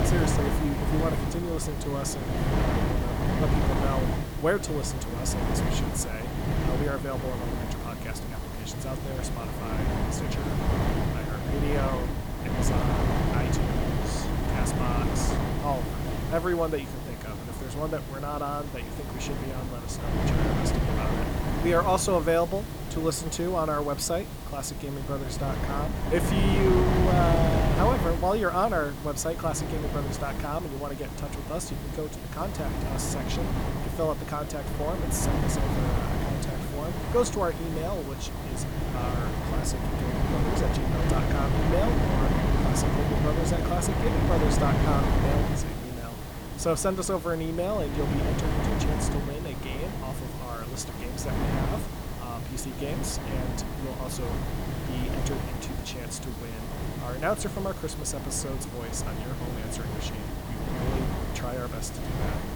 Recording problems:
wind noise on the microphone; heavy; 2 dB below the speech
hiss; noticeable; throughout; 15 dB below the speech

